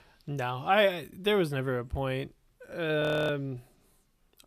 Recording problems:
audio freezing; at 3 s

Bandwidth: 14.5 kHz